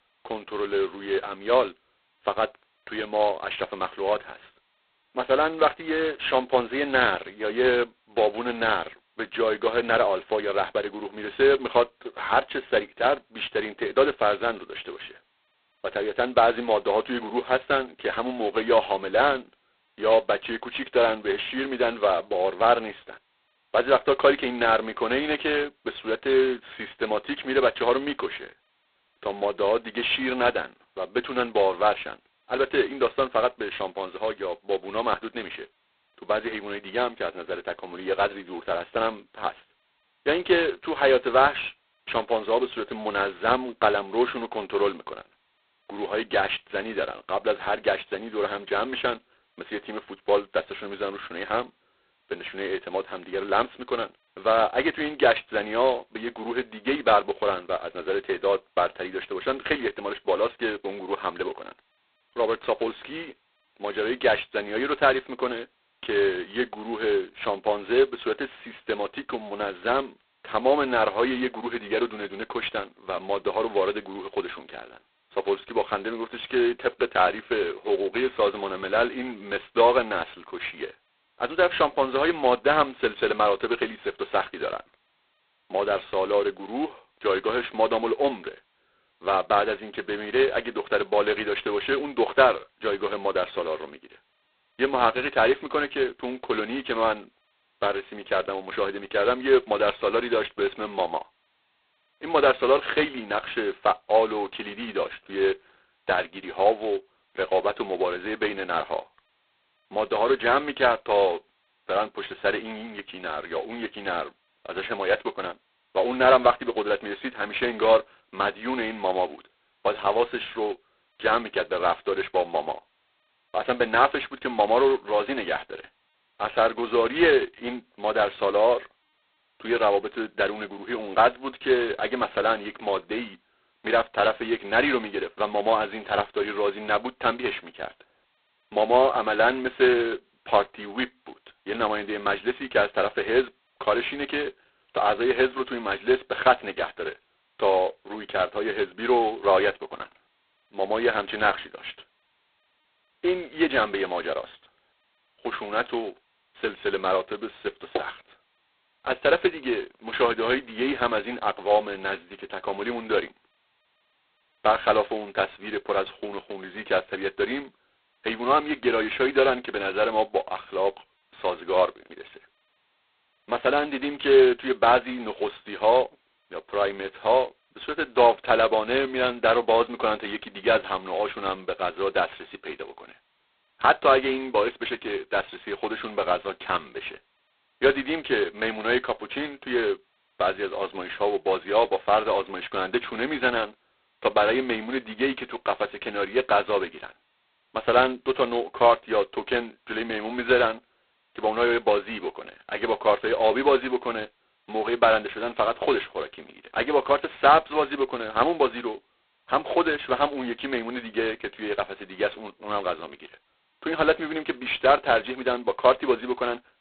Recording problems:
phone-call audio; poor line; nothing above 4 kHz

